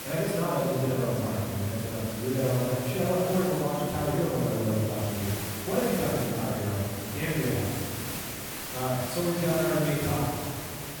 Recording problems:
room echo; strong; dies away in 2 s
off-mic speech; far
hiss; loud; throughout; 7 dB below the speech
chatter from many people; faint; throughout; 25 dB below the speech

